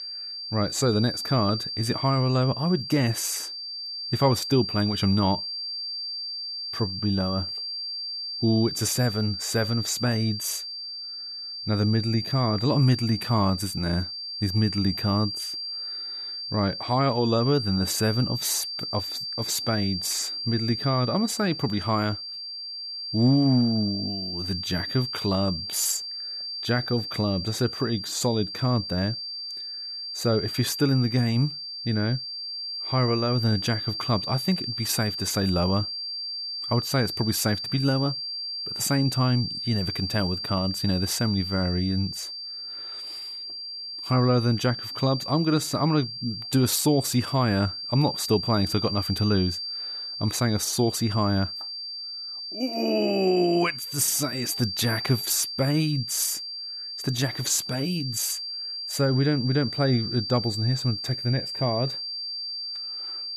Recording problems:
high-pitched whine; loud; throughout; 4.5 kHz, 5 dB below the speech

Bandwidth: 14 kHz